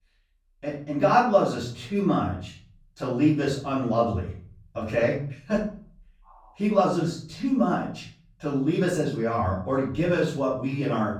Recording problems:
off-mic speech; far
room echo; noticeable; dies away in 0.5 s

